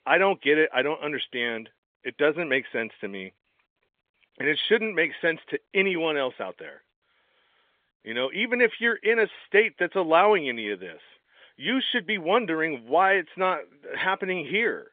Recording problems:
phone-call audio; nothing above 3.5 kHz

